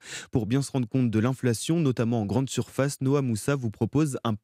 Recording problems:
none

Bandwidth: 15.5 kHz